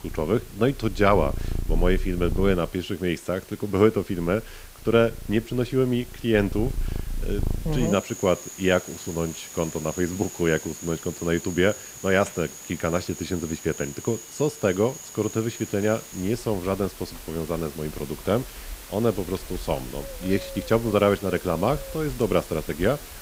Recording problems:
animal sounds; noticeable; throughout; 10 dB below the speech
hiss; noticeable; throughout; 15 dB below the speech

